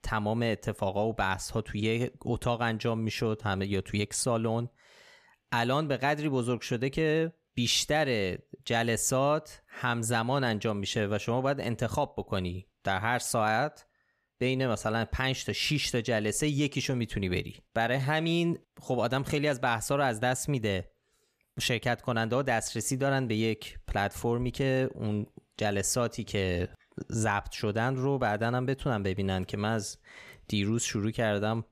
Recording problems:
none

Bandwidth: 14.5 kHz